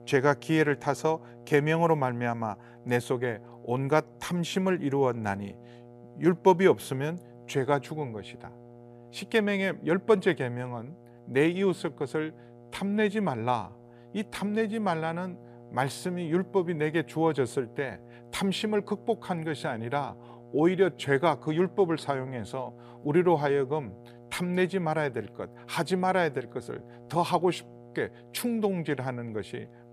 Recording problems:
electrical hum; faint; throughout; 60 Hz, 25 dB below the speech

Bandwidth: 15 kHz